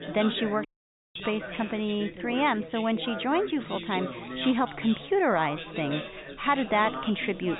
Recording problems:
high frequencies cut off; severe; nothing above 4 kHz
background chatter; loud; throughout; 4 voices, 9 dB below the speech
audio cutting out; at 0.5 s

